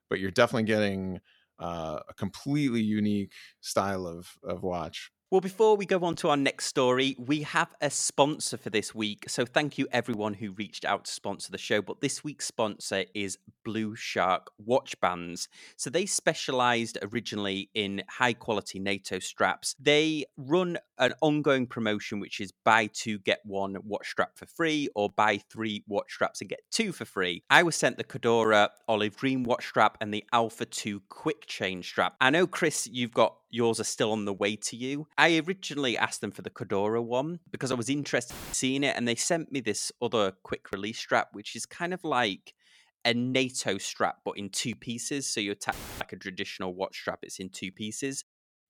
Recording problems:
audio cutting out; filled with static; at 38 s and at 46 s

